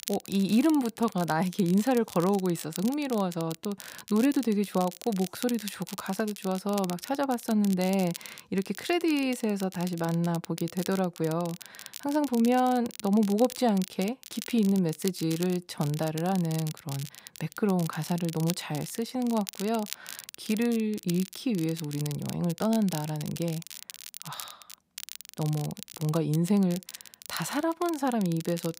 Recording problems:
crackle, like an old record; noticeable; 15 dB below the speech

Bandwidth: 15.5 kHz